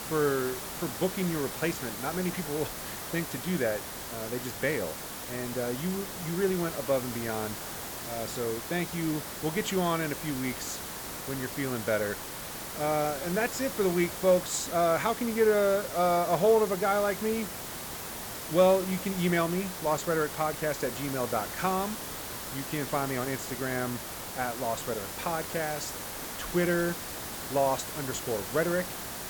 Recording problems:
hiss; loud; throughout; 6 dB below the speech

